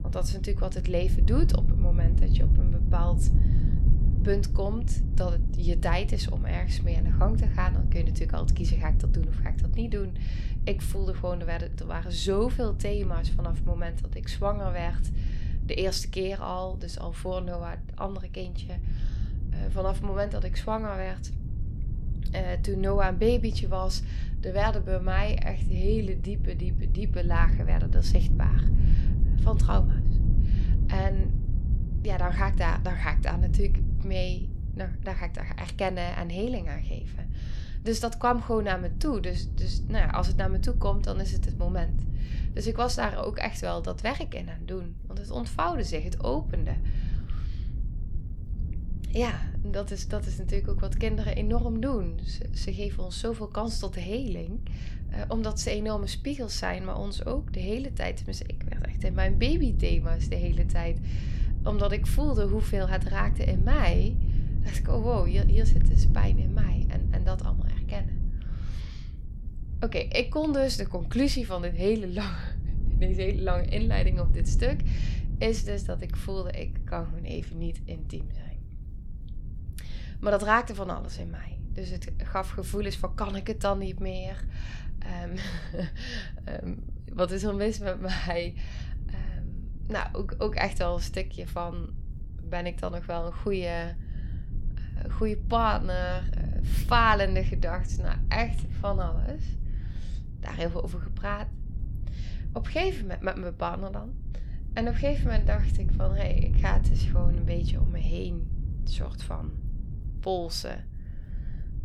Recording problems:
low rumble; noticeable; throughout; 15 dB below the speech

